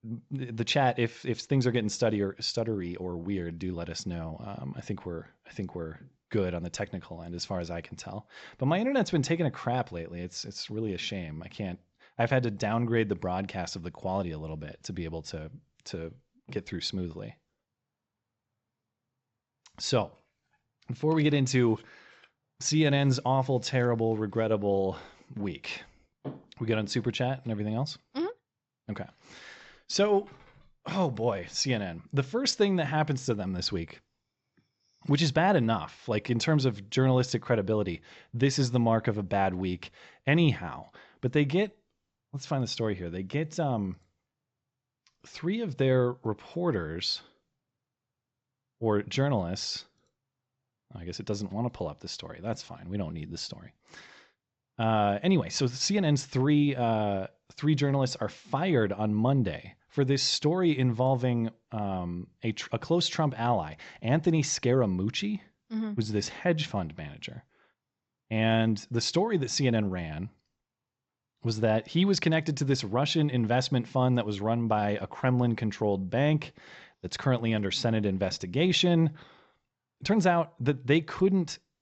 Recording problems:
high frequencies cut off; noticeable; nothing above 7.5 kHz

